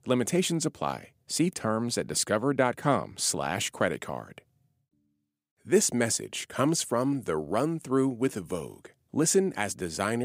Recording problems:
abrupt cut into speech; at the end

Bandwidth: 15.5 kHz